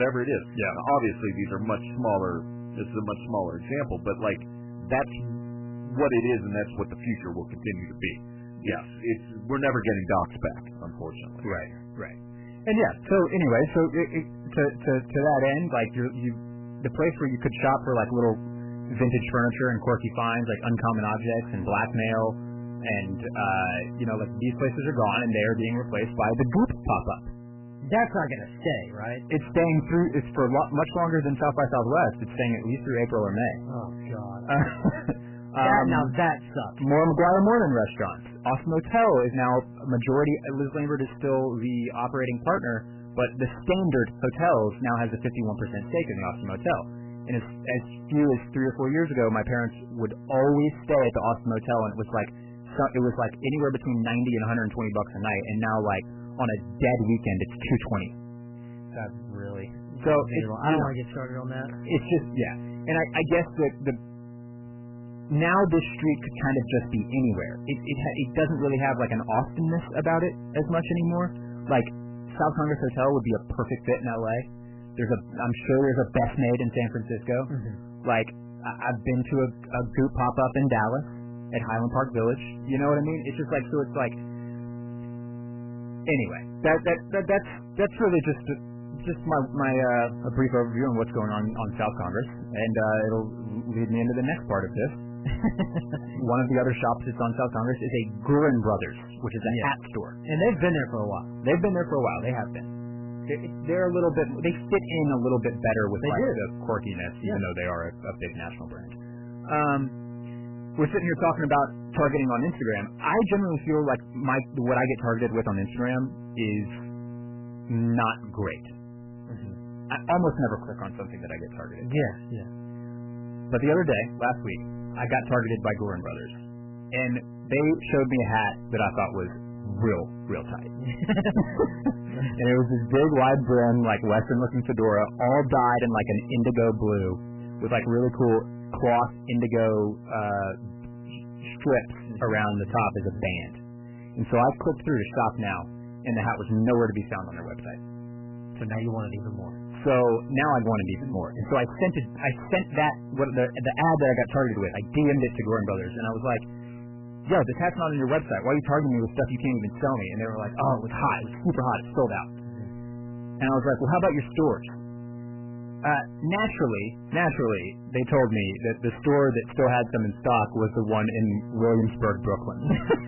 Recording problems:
garbled, watery; badly; nothing above 3 kHz
distortion; slight; 7% of the sound clipped
electrical hum; noticeable; throughout; 60 Hz, 20 dB below the speech
abrupt cut into speech; at the start

